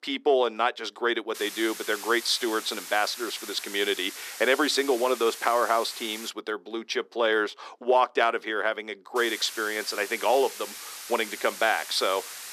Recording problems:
thin; somewhat; fading below 300 Hz
hiss; noticeable; from 1.5 to 6.5 s and from 9 s on; 10 dB below the speech

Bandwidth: 14 kHz